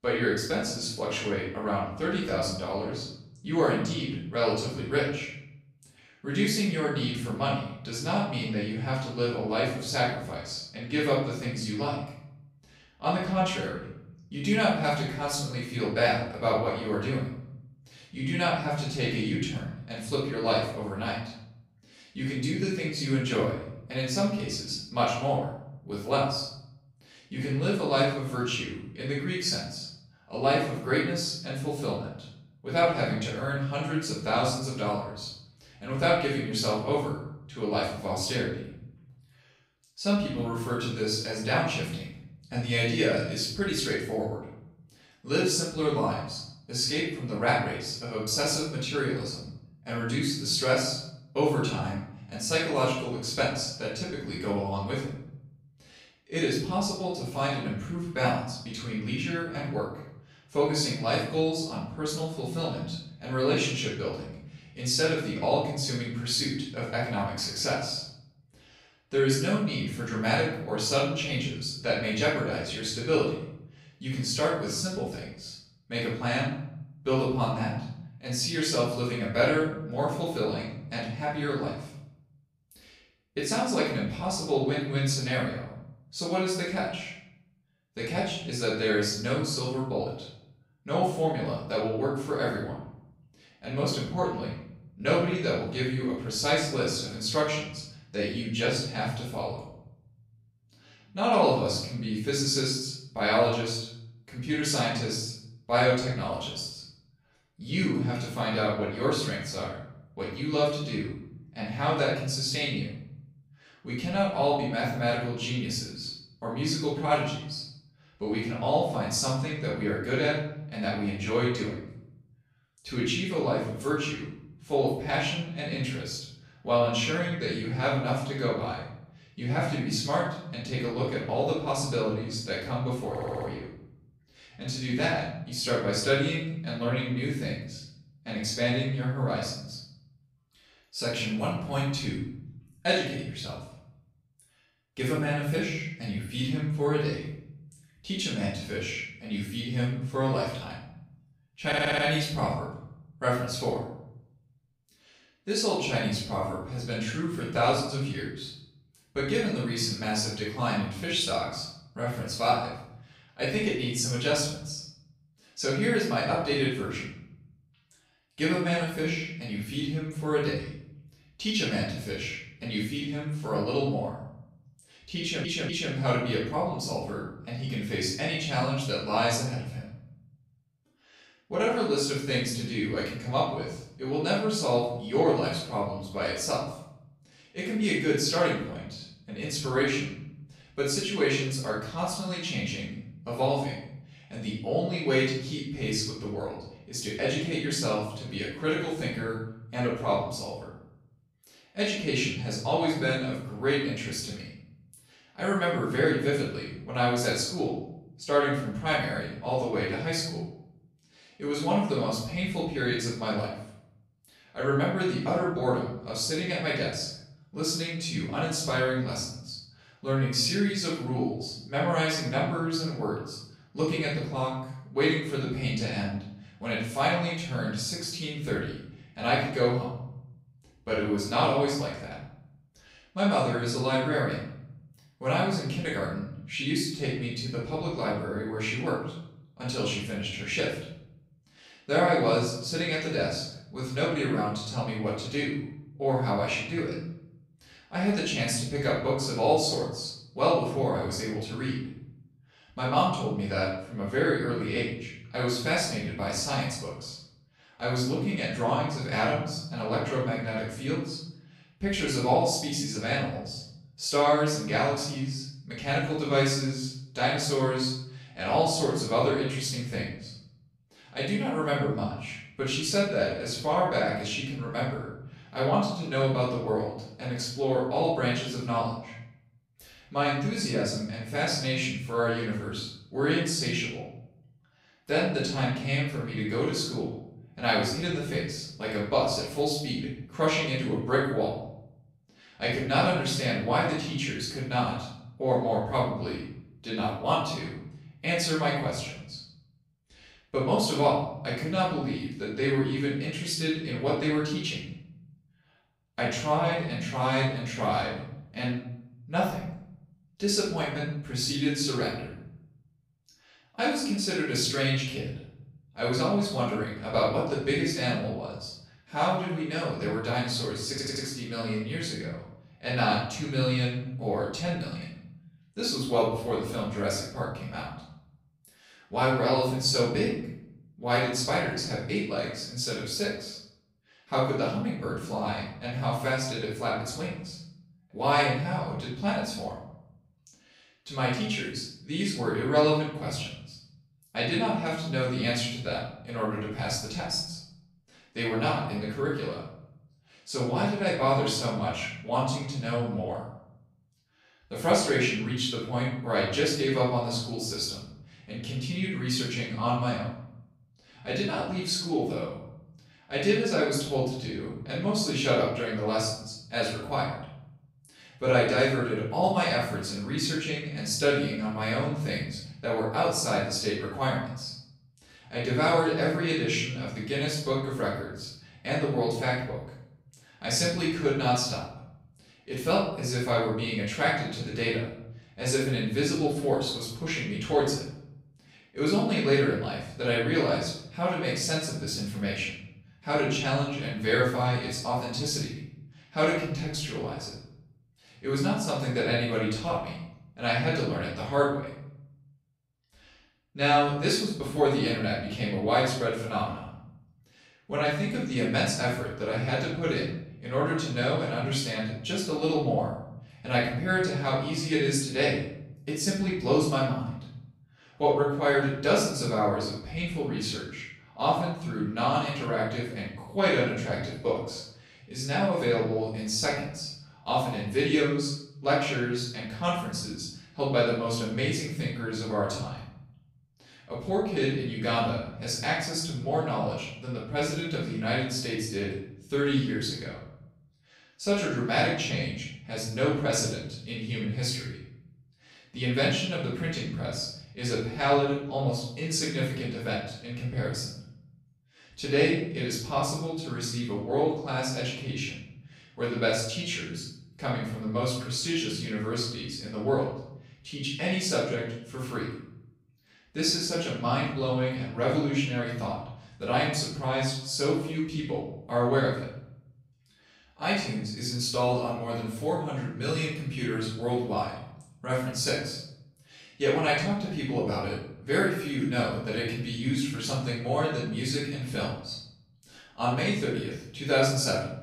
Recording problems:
off-mic speech; far
room echo; noticeable; dies away in 0.7 s
audio stuttering; 4 times, first at 2:13

